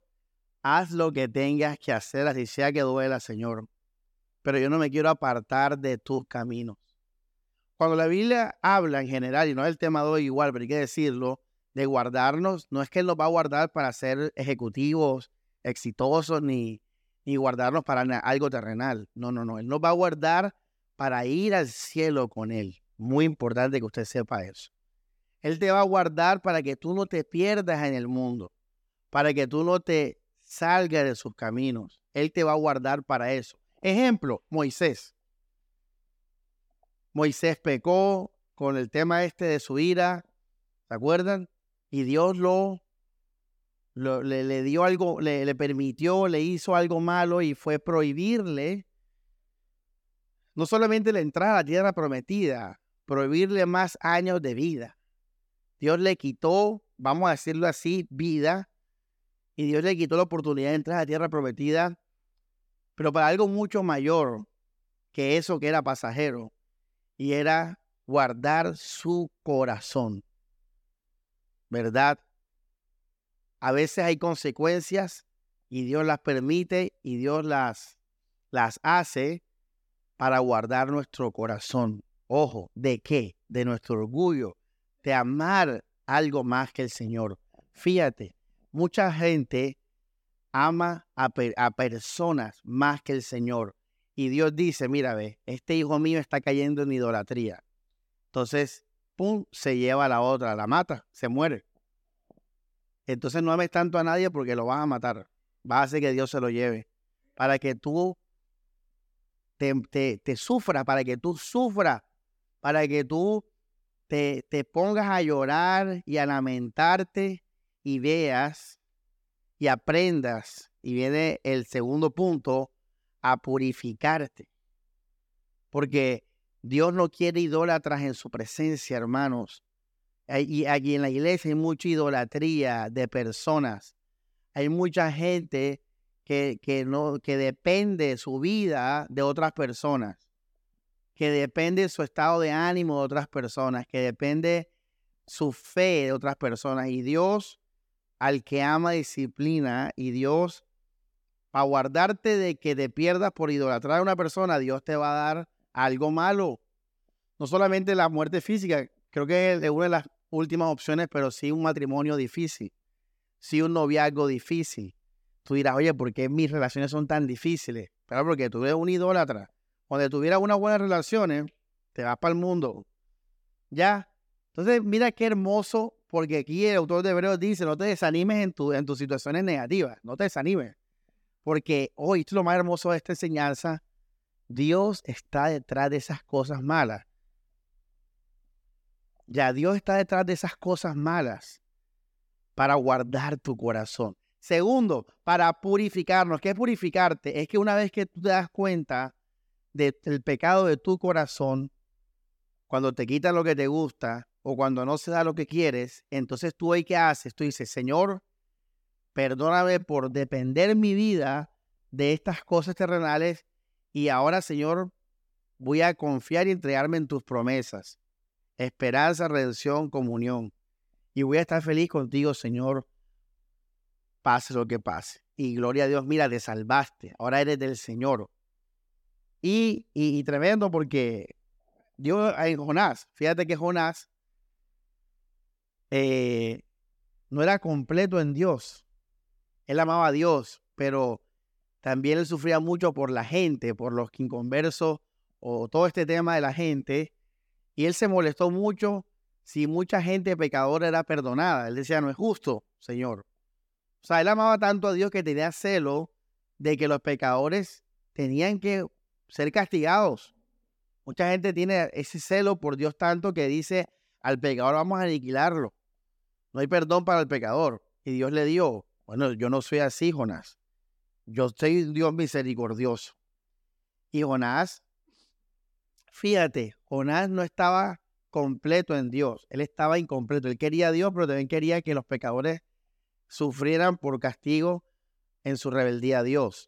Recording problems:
none

